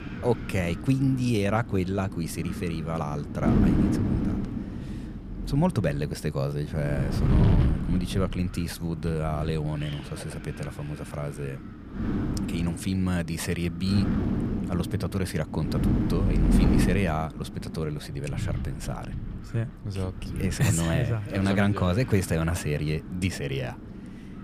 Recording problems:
wind noise on the microphone; heavy; 5 dB below the speech

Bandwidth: 15 kHz